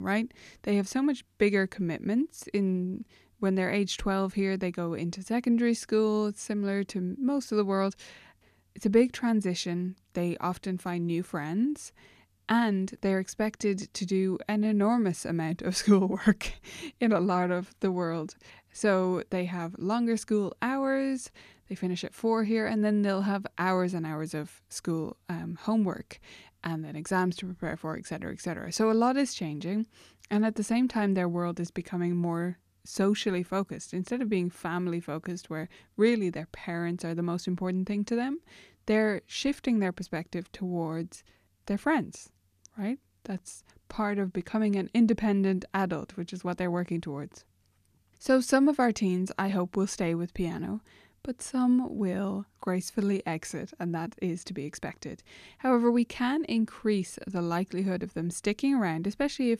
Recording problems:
abrupt cut into speech; at the start

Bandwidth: 14.5 kHz